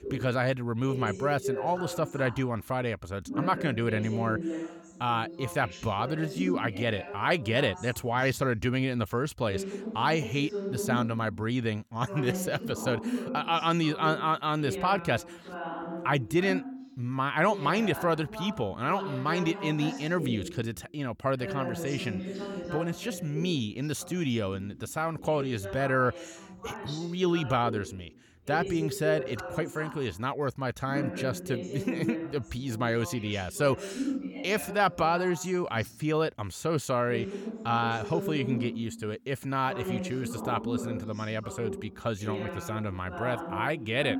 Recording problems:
voice in the background; loud; throughout; 8 dB below the speech

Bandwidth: 18 kHz